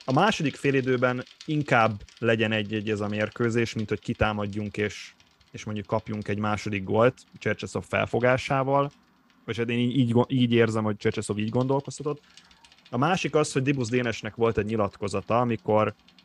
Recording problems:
traffic noise; faint; throughout; 30 dB below the speech

